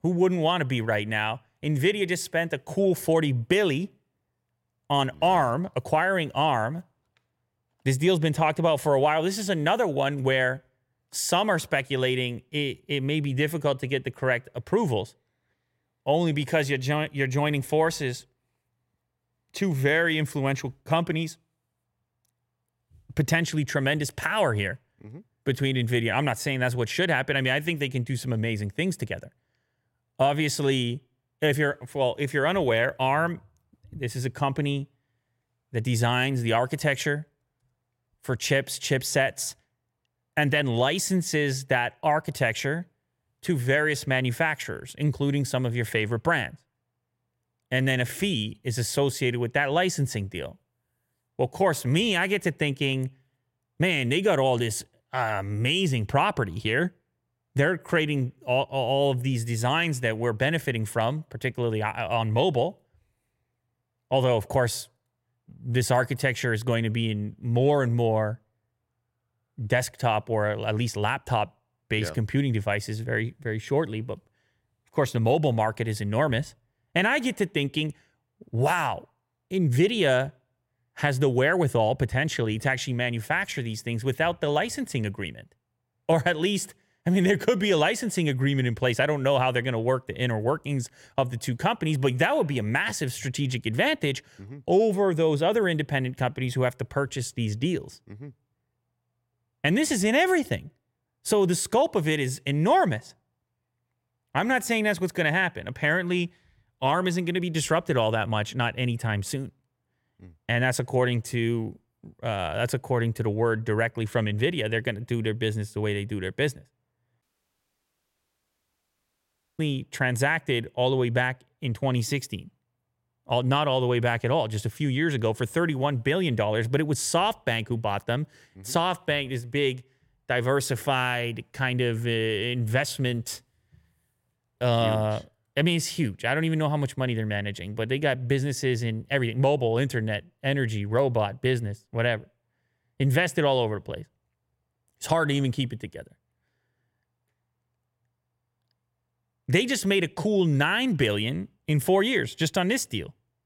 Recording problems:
audio cutting out; at 1:57 for 2.5 s

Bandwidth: 16.5 kHz